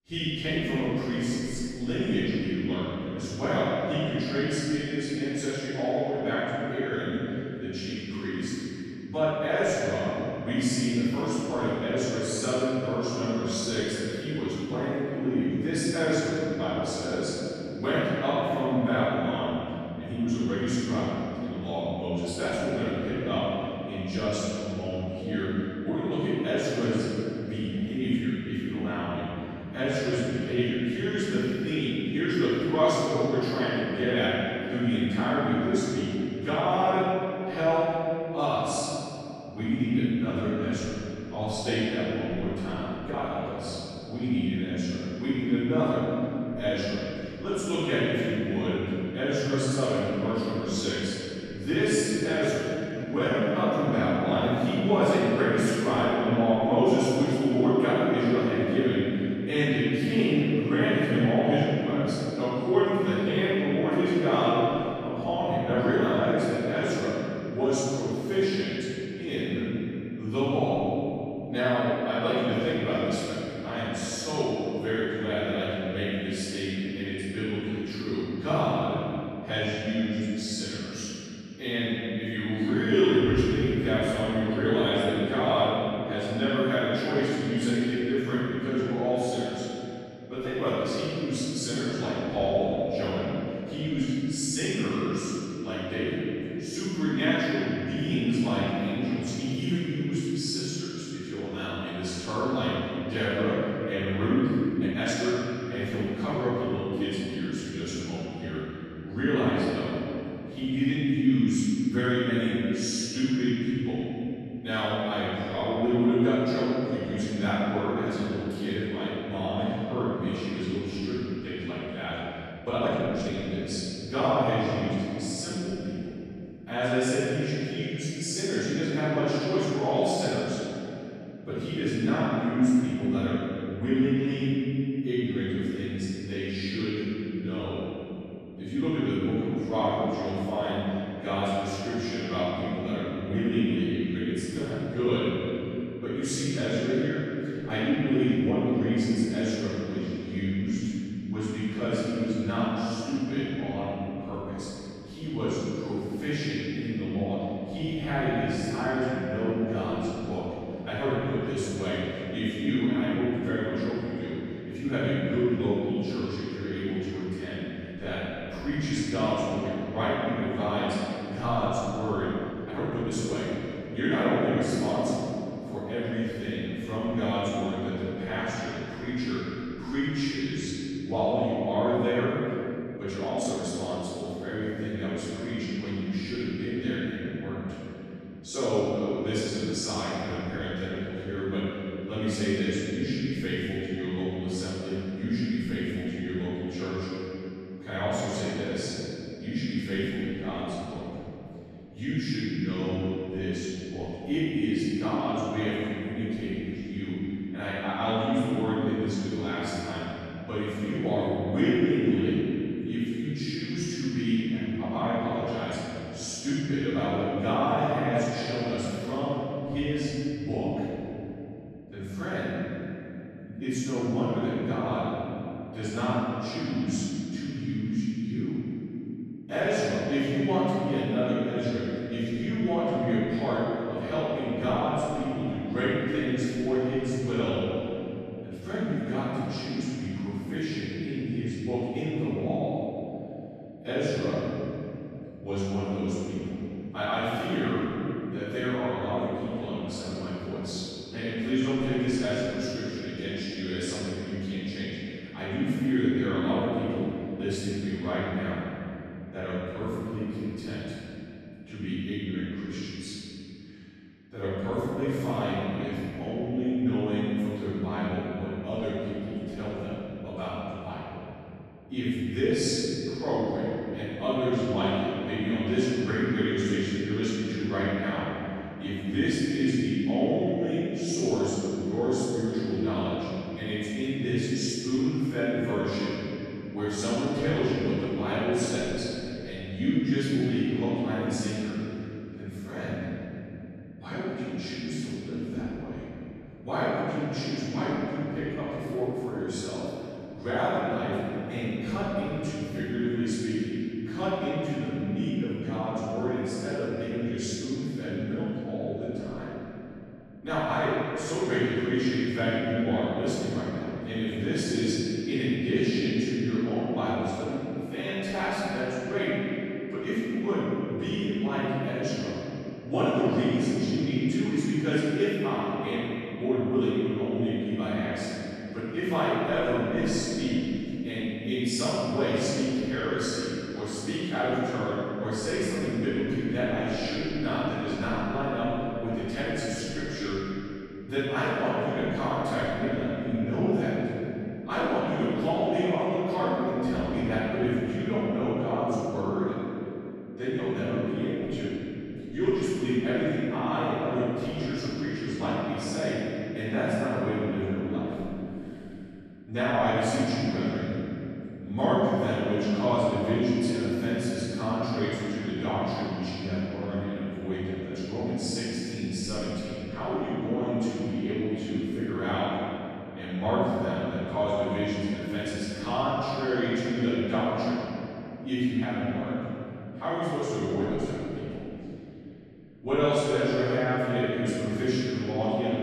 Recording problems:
room echo; strong; dies away in 3 s
off-mic speech; far
uneven, jittery; strongly; from 43 s to 3:04

